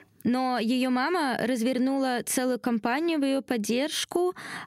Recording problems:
squashed, flat; somewhat

